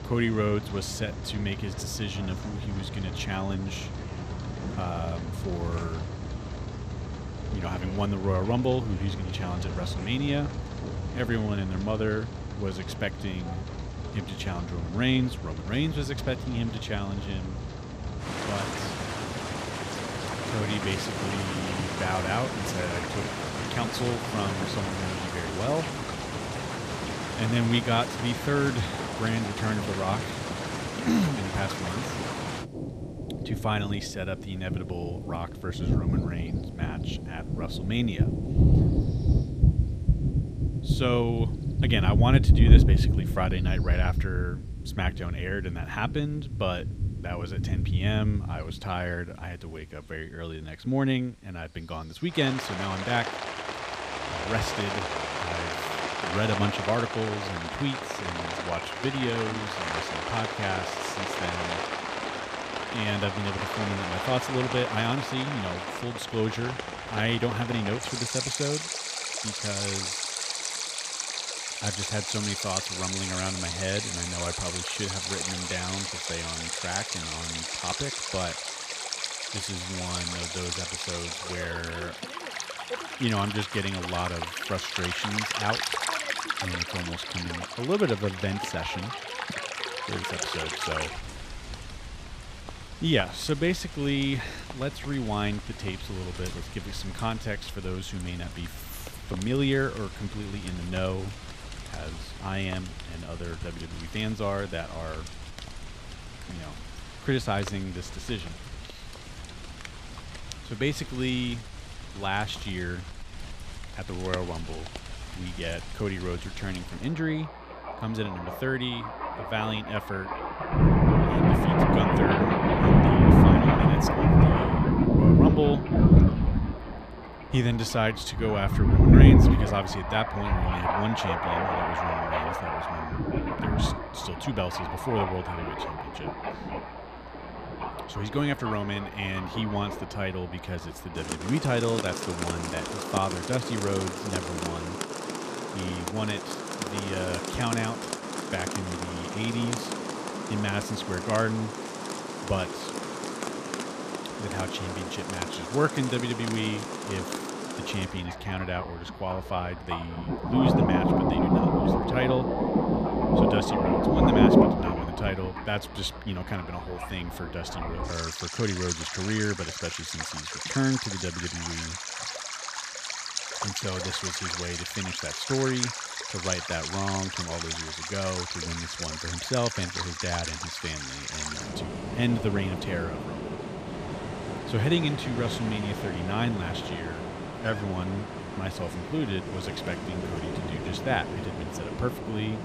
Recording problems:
rain or running water; very loud; throughout; 3 dB above the speech

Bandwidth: 15 kHz